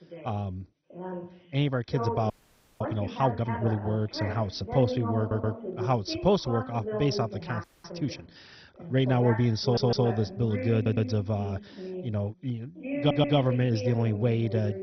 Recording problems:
garbled, watery; badly; nothing above 6 kHz
voice in the background; loud; throughout; 8 dB below the speech
audio freezing; at 2.5 s for 0.5 s and at 7.5 s
audio stuttering; 4 times, first at 5 s

